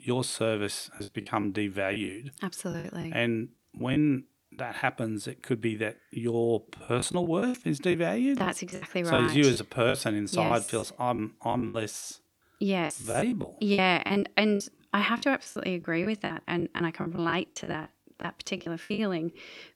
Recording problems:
choppy; very; 11% of the speech affected

